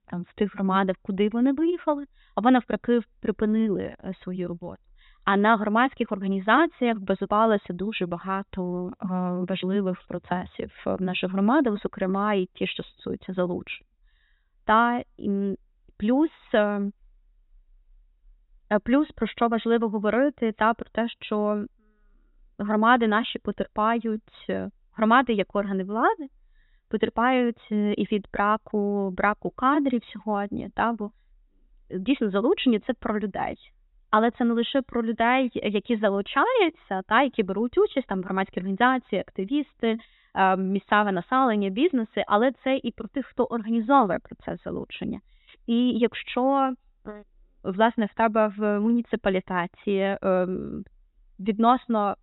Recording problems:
high frequencies cut off; severe; nothing above 4 kHz

